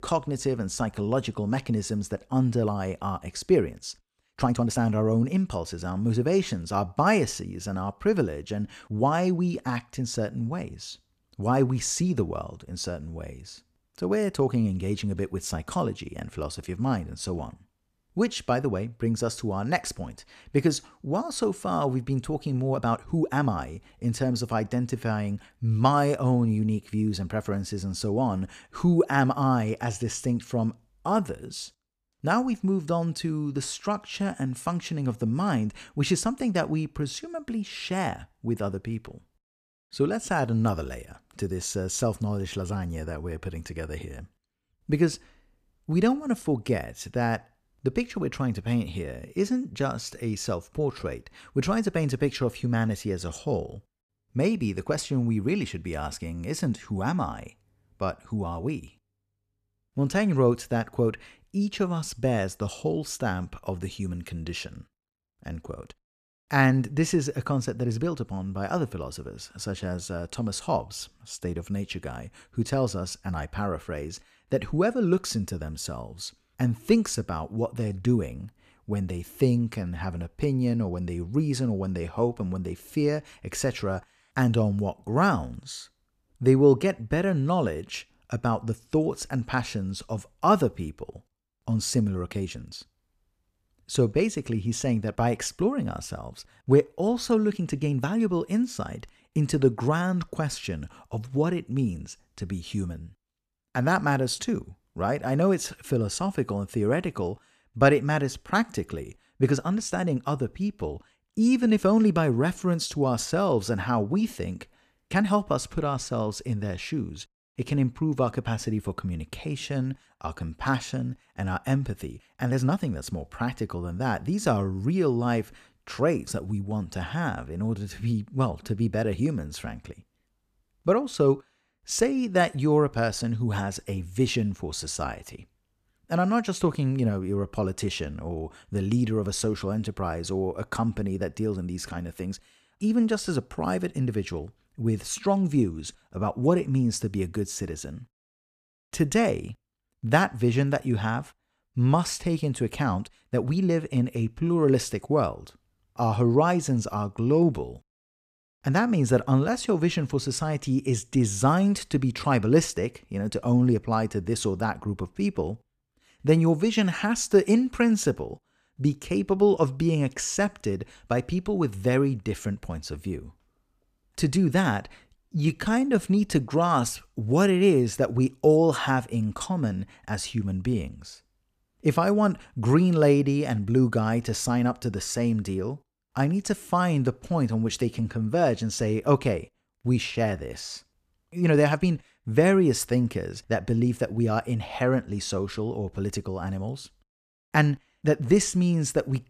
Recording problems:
uneven, jittery; strongly; from 4.5 s to 3:12

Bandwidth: 14.5 kHz